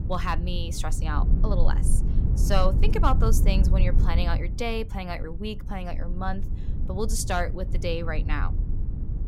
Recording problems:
low rumble; noticeable; throughout; 10 dB below the speech

